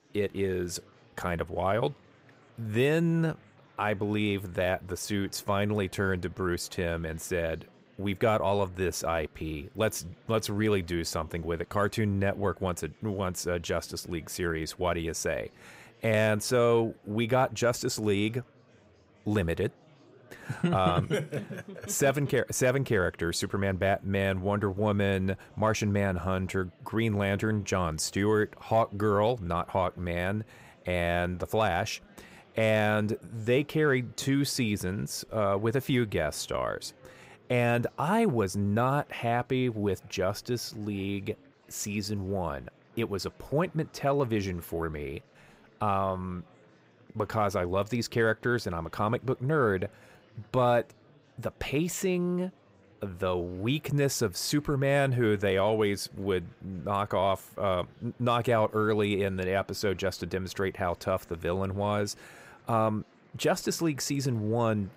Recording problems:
murmuring crowd; faint; throughout; 30 dB below the speech

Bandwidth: 15.5 kHz